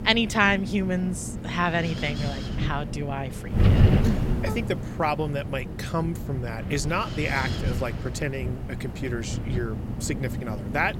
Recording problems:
wind noise on the microphone; heavy; 9 dB below the speech

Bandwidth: 16 kHz